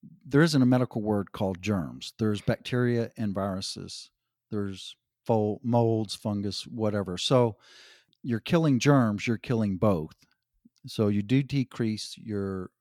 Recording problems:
none

